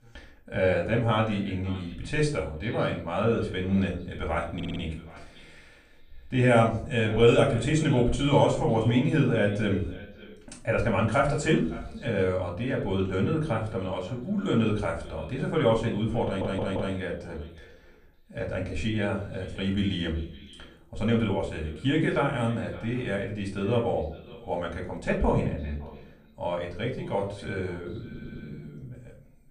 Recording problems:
off-mic speech; far
echo of what is said; faint; throughout; 560 ms later, 20 dB below the speech
room echo; slight; dies away in 0.4 s
audio stuttering; at 4.5 s, at 16 s and at 28 s

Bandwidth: 15 kHz